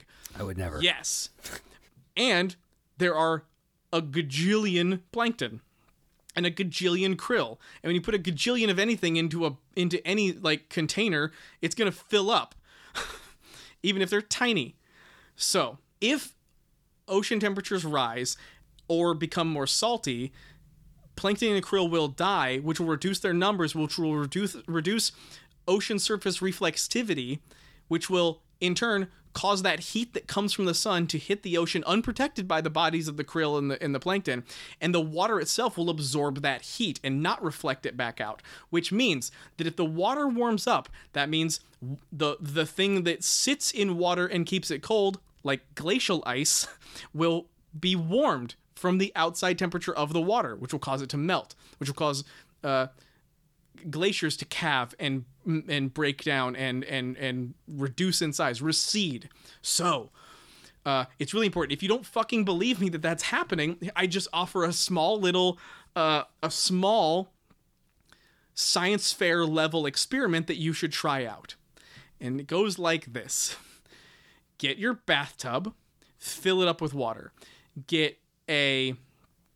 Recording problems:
none

